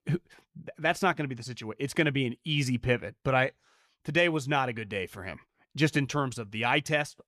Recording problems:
none

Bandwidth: 14.5 kHz